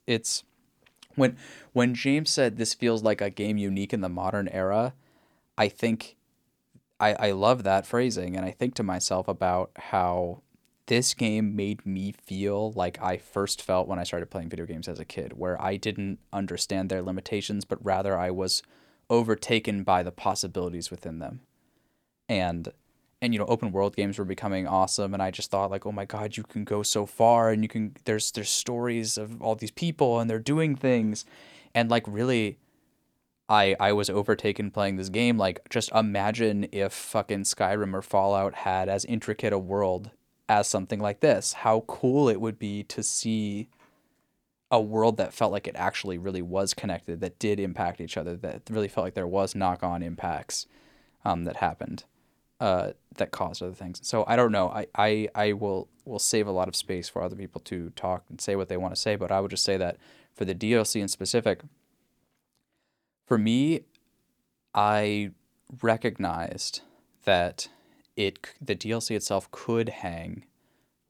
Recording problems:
none

